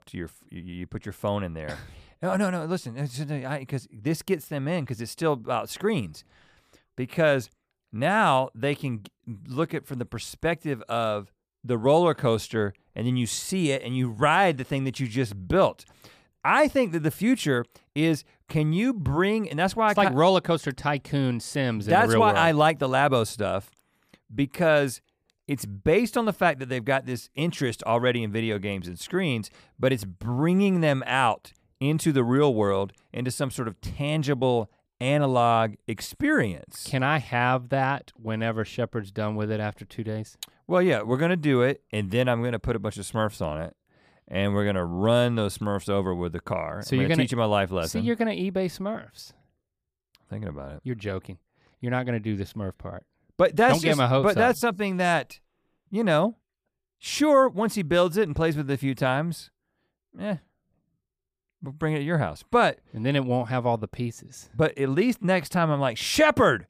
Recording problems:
none

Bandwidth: 15 kHz